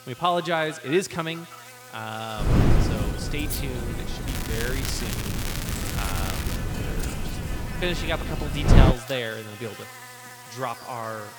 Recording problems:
echo of what is said; noticeable; throughout; 160 ms later, 15 dB below the speech
wind noise on the microphone; heavy; from 2.5 to 9 s; 4 dB below the speech
crackling; loud; from 4.5 to 6.5 s; 3 dB below the speech
electrical hum; noticeable; throughout; 60 Hz, 10 dB below the speech

